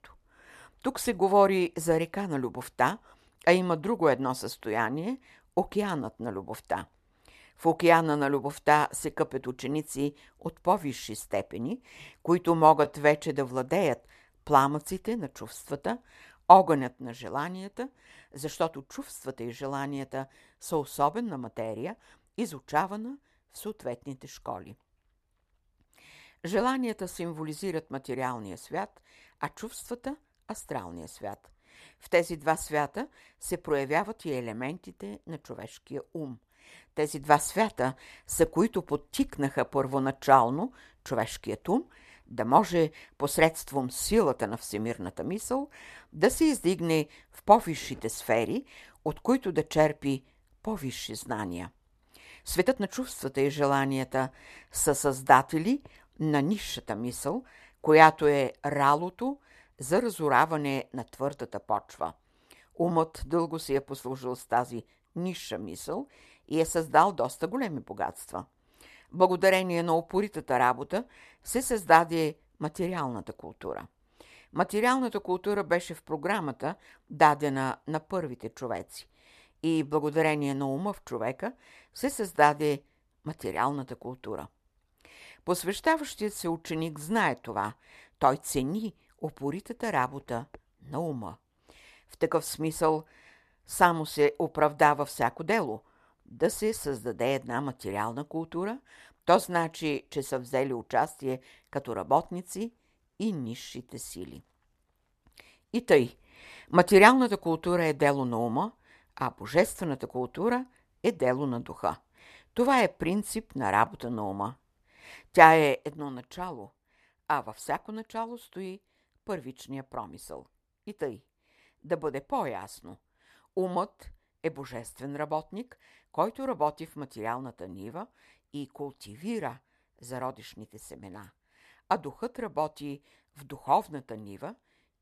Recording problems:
uneven, jittery; strongly; from 13 s to 2:08

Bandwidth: 13.5 kHz